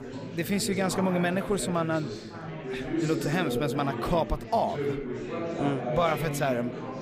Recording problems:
chatter from many people; loud; throughout; 5 dB below the speech

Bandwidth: 15 kHz